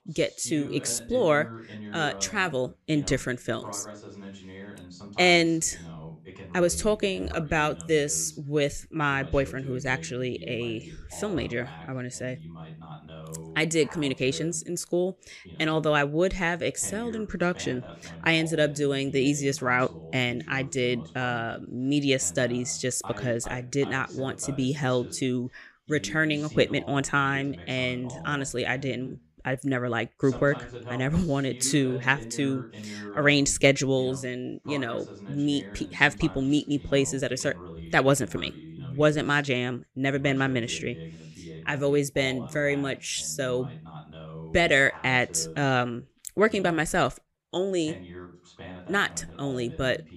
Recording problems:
voice in the background; noticeable; throughout; 15 dB below the speech

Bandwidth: 15 kHz